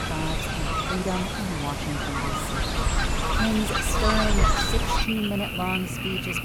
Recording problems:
animal sounds; very loud; throughout; 4 dB above the speech

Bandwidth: 18.5 kHz